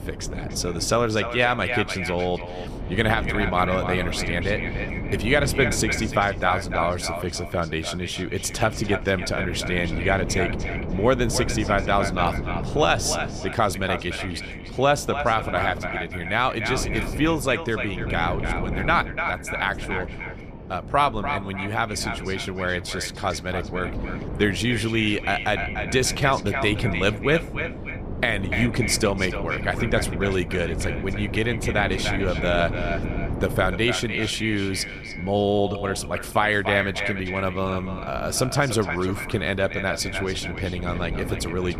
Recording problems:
echo of what is said; strong; throughout; 290 ms later, 7 dB below the speech
wind noise on the microphone; occasional gusts; 15 dB below the speech

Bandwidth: 14.5 kHz